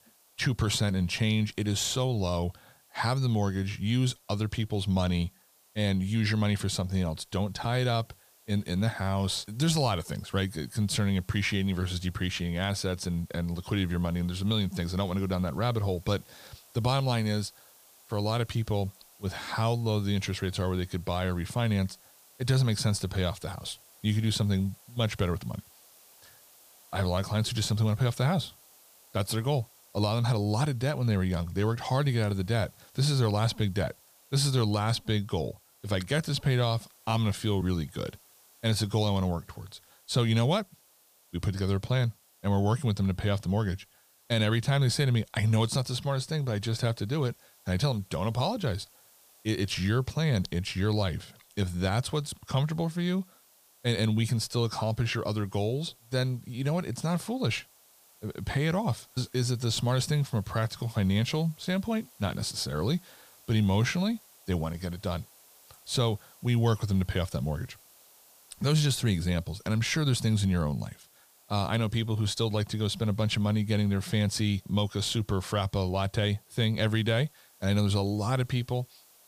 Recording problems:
hiss; faint; throughout; 25 dB below the speech

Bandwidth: 15 kHz